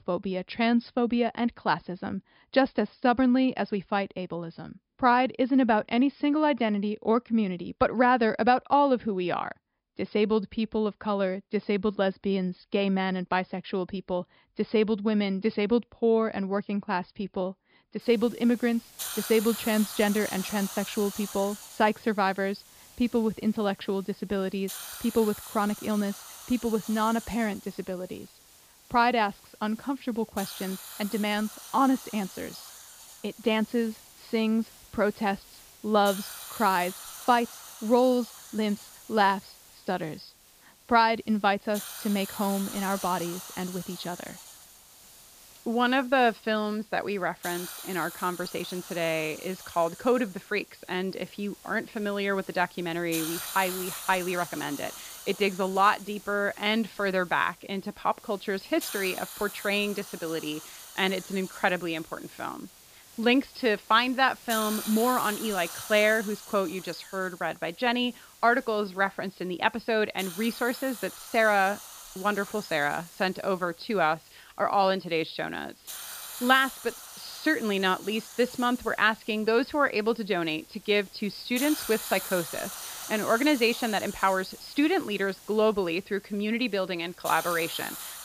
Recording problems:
high frequencies cut off; noticeable; nothing above 5.5 kHz
hiss; noticeable; from 18 s on; 10 dB below the speech

